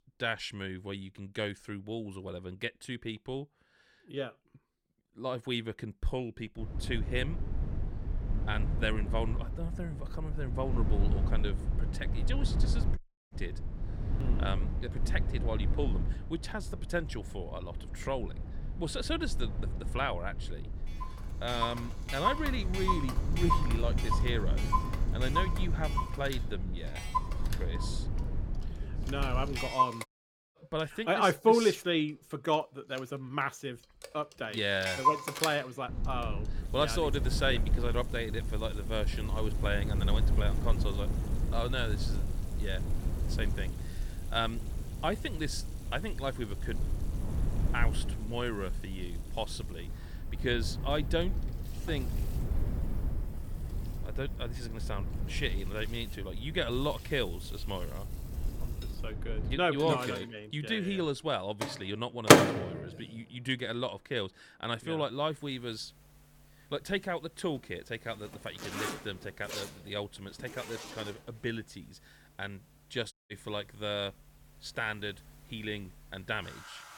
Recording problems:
household noises; very loud; from 21 s on; 3 dB above the speech
low rumble; noticeable; from 6.5 to 30 s and from 36 s to 1:00; 15 dB below the speech
audio cutting out; at 13 s, at 30 s and at 1:13

